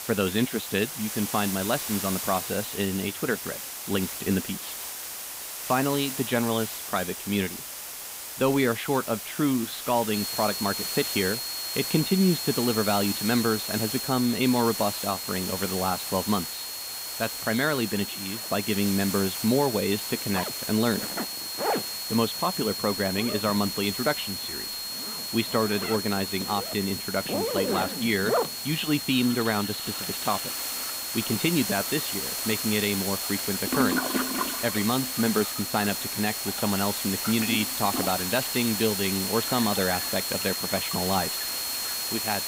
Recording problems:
muffled; slightly; fading above 3.5 kHz
high-pitched whine; loud; from 10 s on; 4.5 kHz, 7 dB below the speech
household noises; loud; throughout; 8 dB below the speech
hiss; loud; throughout; 4 dB below the speech

